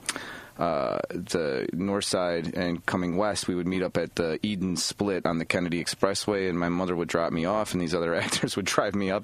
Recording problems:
squashed, flat; heavily

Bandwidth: 14.5 kHz